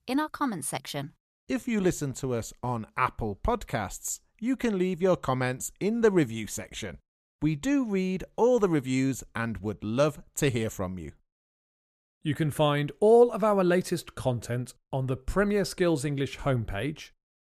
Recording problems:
none

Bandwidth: 14 kHz